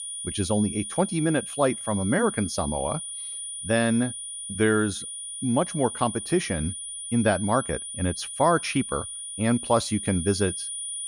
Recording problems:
high-pitched whine; loud; throughout; 9.5 kHz, 7 dB below the speech

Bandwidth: 14.5 kHz